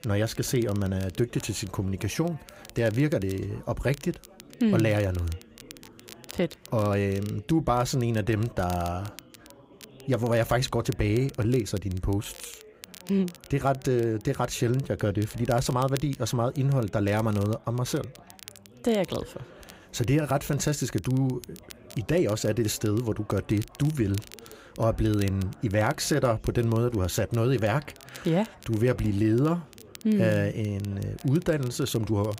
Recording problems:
background chatter; faint; throughout; 4 voices, 25 dB below the speech
crackle, like an old record; faint; 20 dB below the speech

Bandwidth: 15.5 kHz